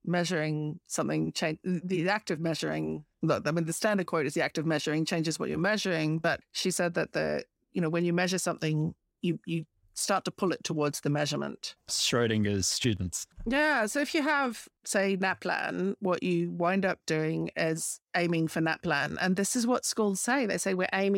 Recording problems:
abrupt cut into speech; at the end

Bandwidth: 16 kHz